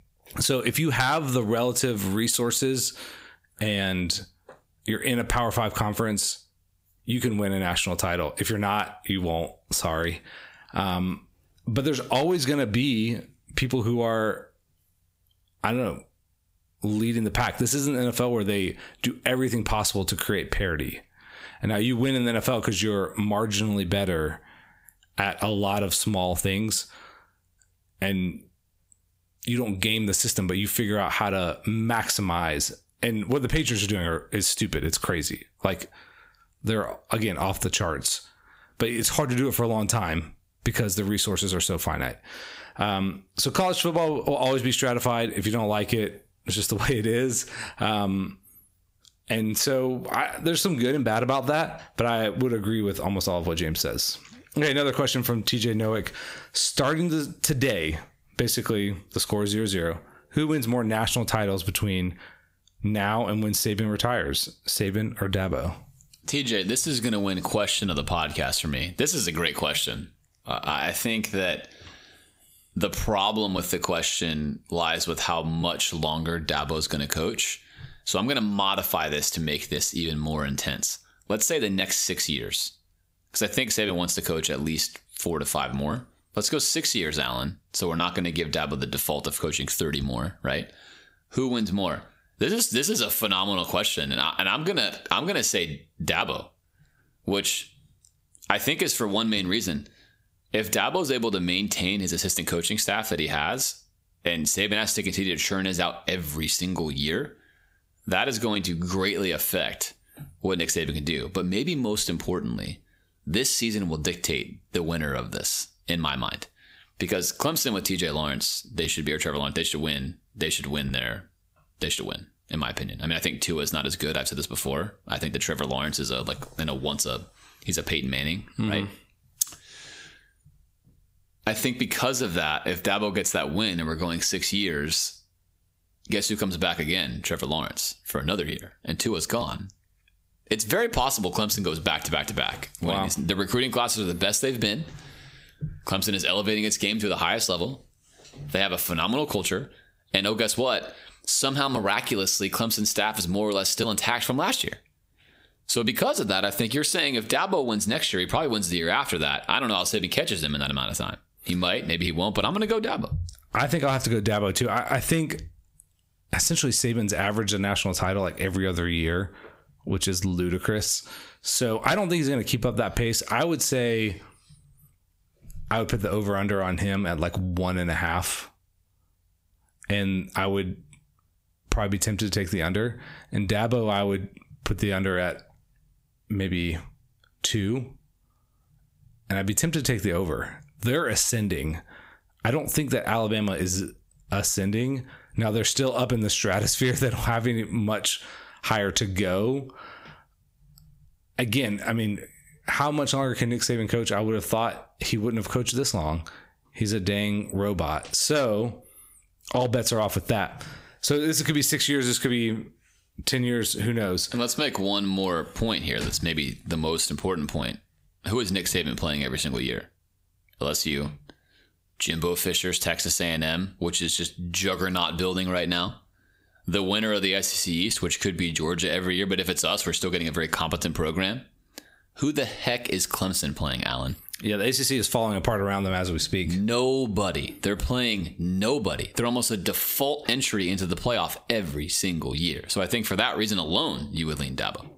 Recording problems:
squashed, flat; heavily

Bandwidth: 15.5 kHz